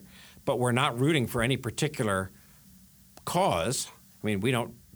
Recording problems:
hiss; faint; throughout; 25 dB below the speech

